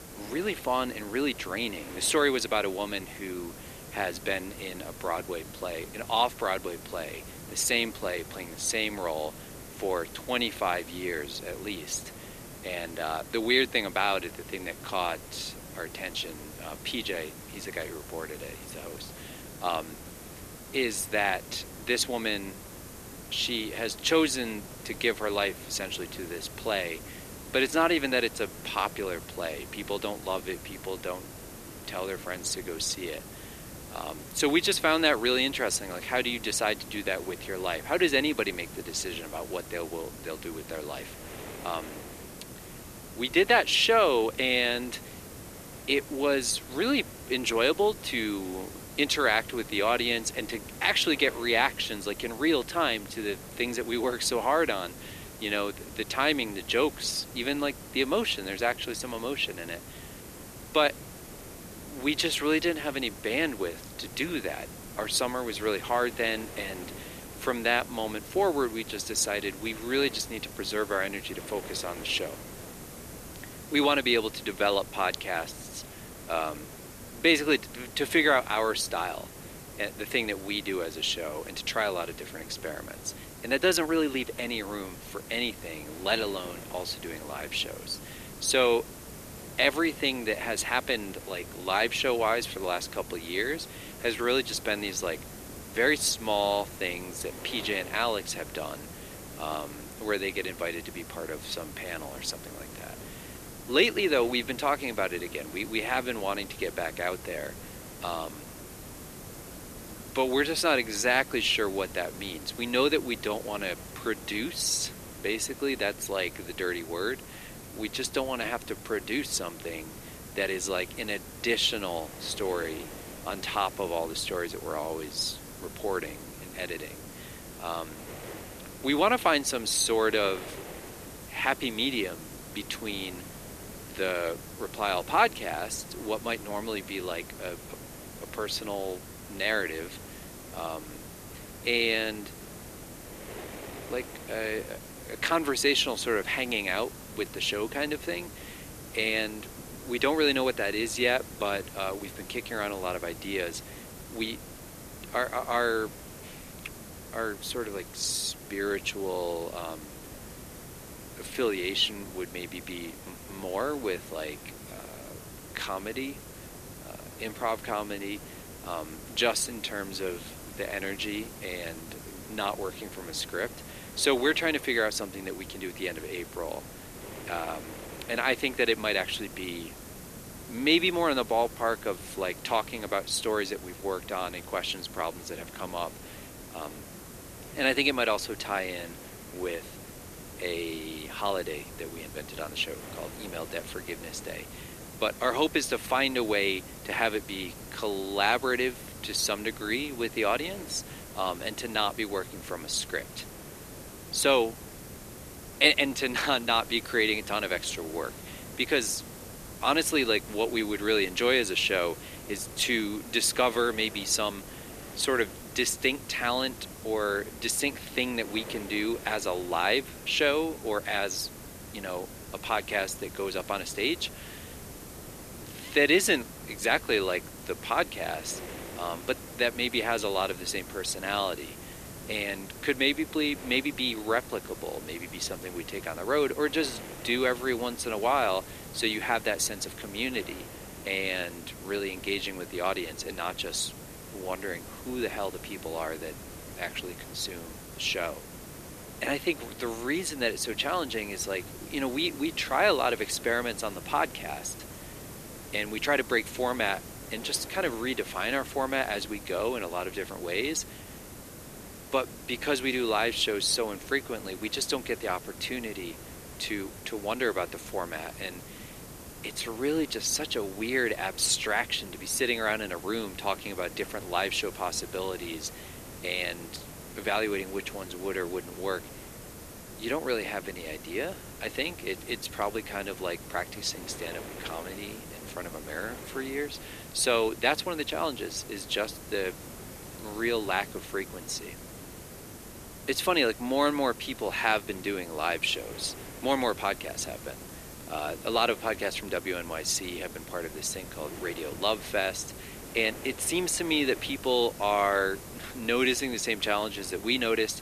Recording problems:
thin; somewhat; fading below 300 Hz
wind noise on the microphone; occasional gusts; 25 dB below the speech
hiss; noticeable; throughout; 15 dB below the speech

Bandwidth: 14.5 kHz